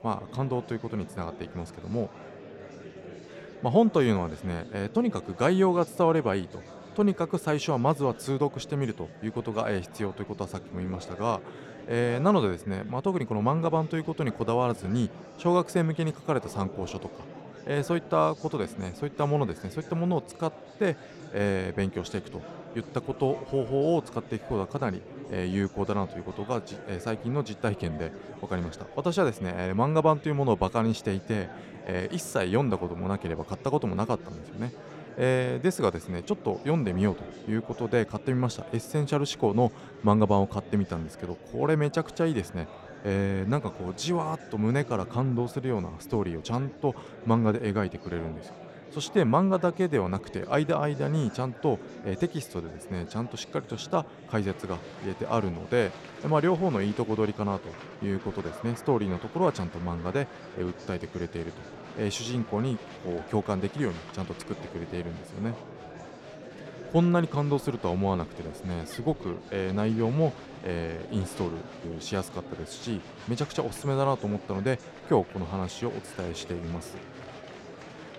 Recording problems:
murmuring crowd; noticeable; throughout; 15 dB below the speech

